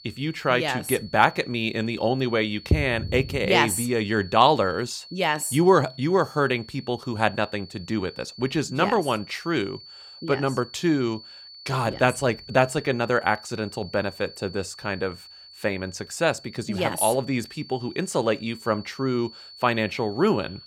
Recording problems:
high-pitched whine; noticeable; throughout; 4.5 kHz, 20 dB below the speech

